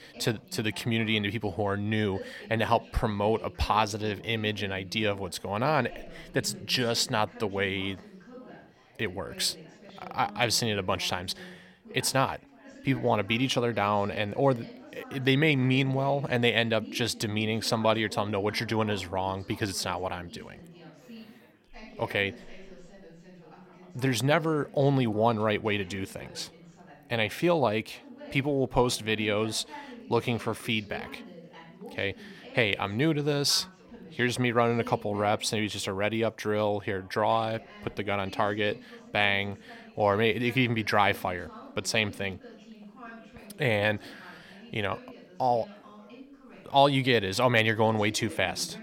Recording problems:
background chatter; noticeable; throughout; 4 voices, 20 dB below the speech

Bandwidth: 16.5 kHz